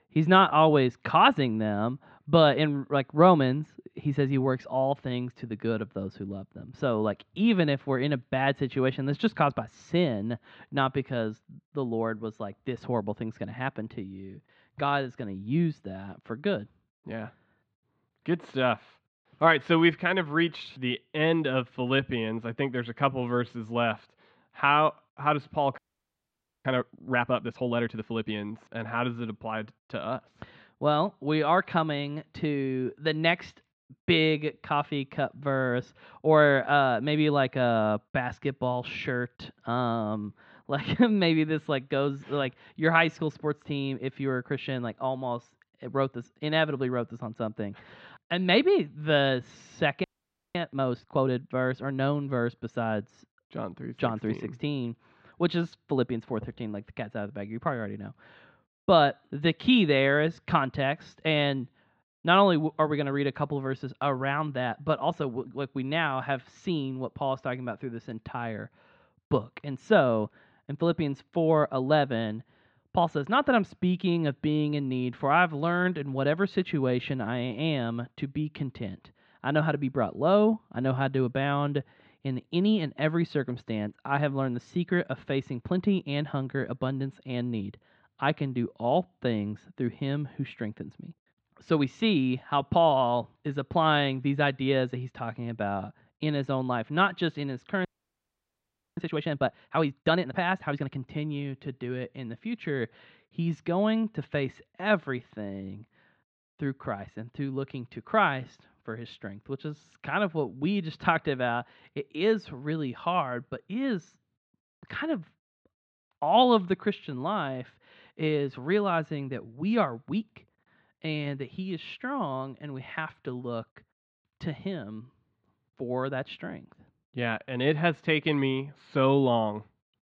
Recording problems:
muffled; slightly; fading above 4 kHz
audio freezing; at 26 s for 1 s, at 50 s for 0.5 s and at 1:38 for 1 s

